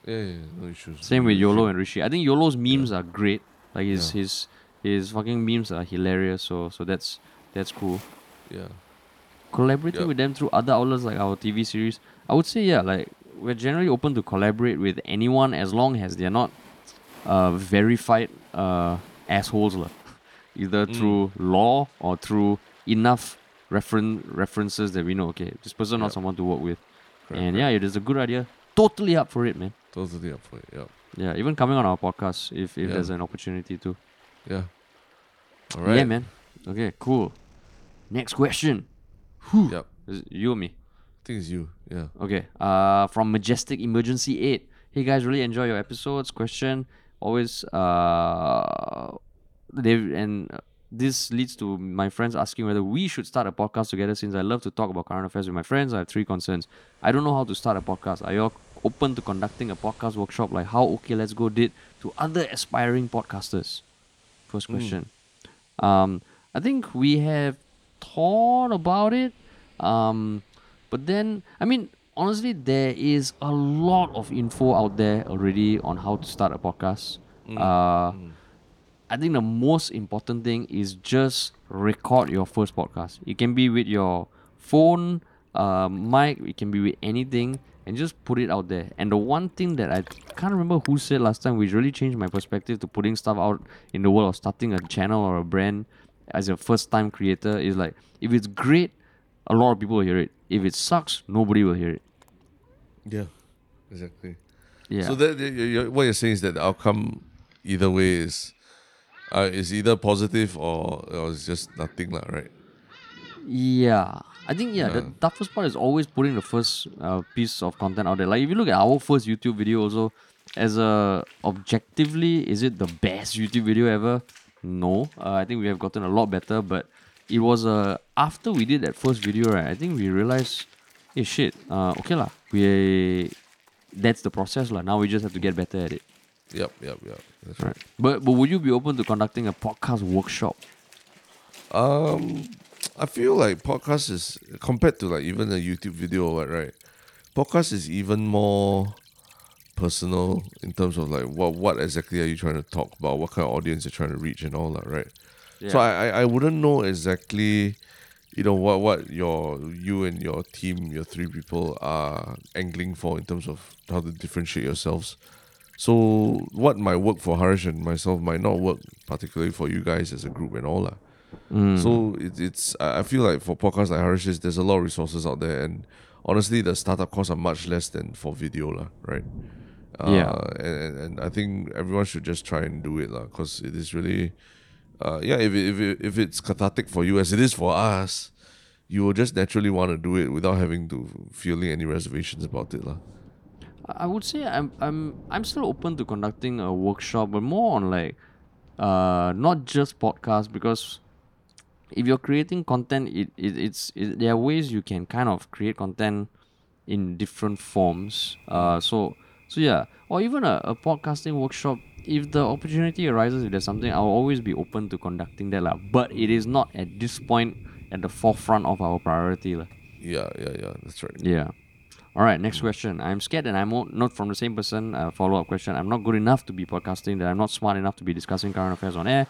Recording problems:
rain or running water; faint; throughout; 25 dB below the speech

